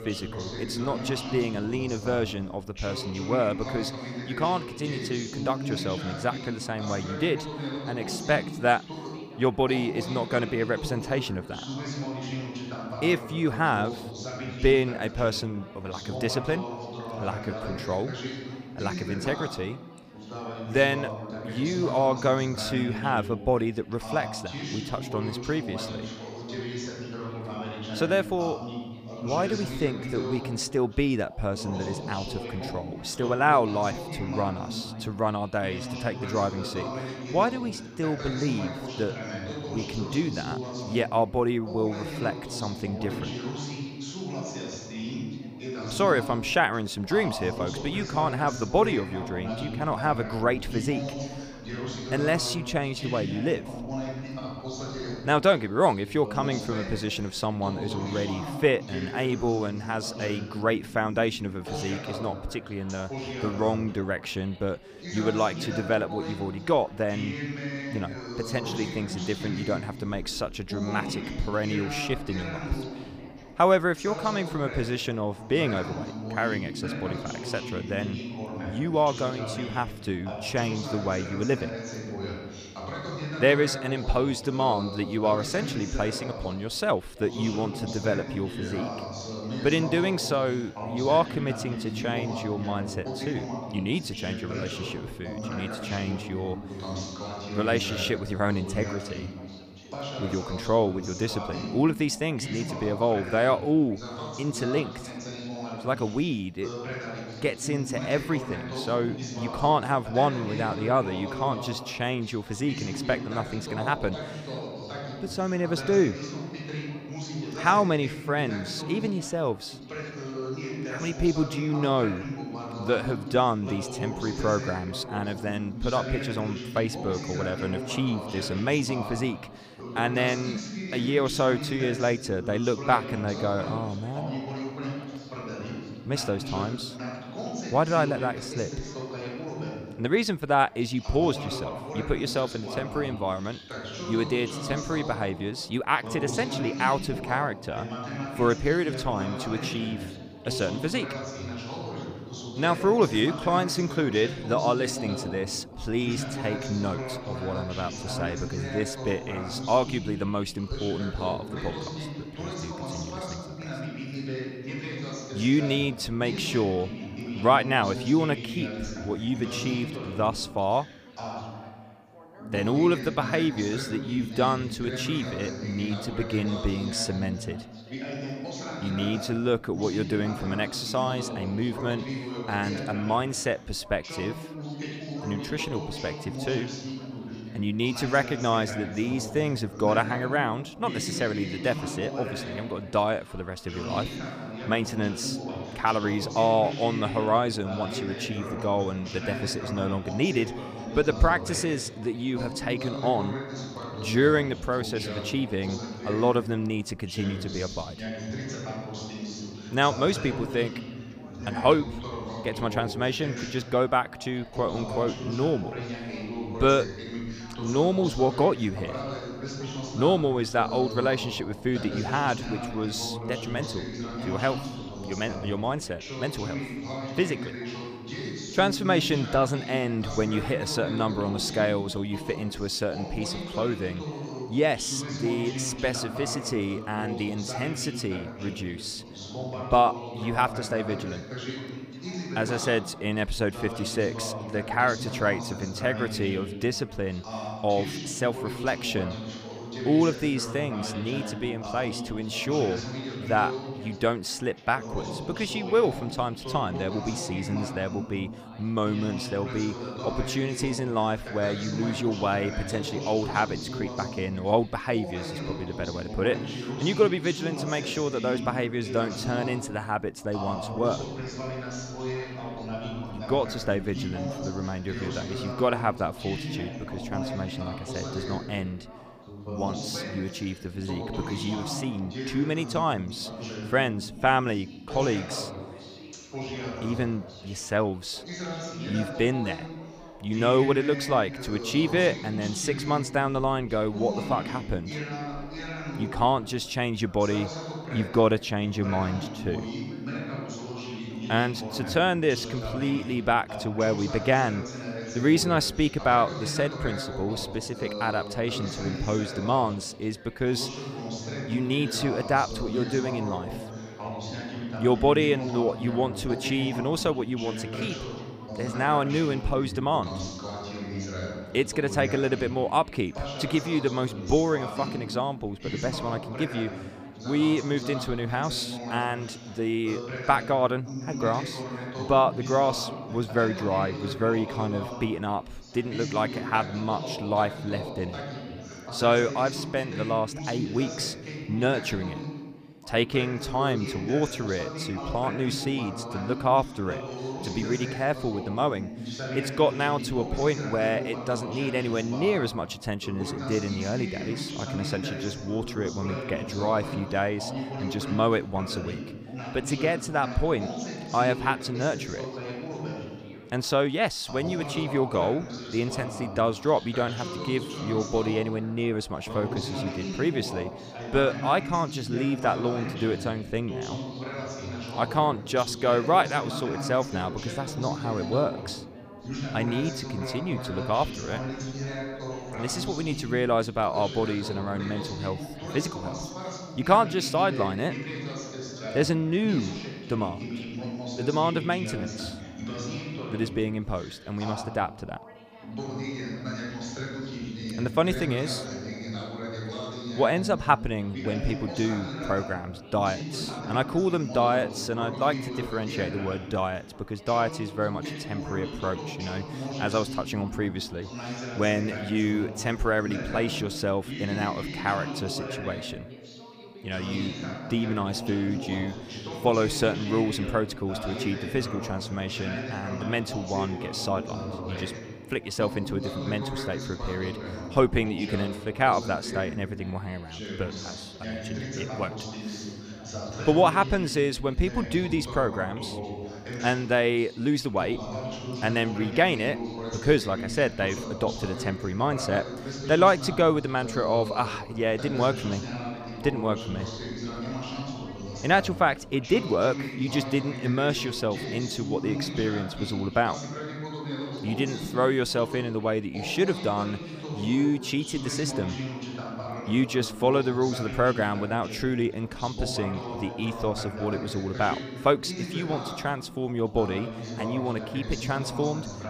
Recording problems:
background chatter; loud; throughout; 2 voices, 8 dB below the speech

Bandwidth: 15 kHz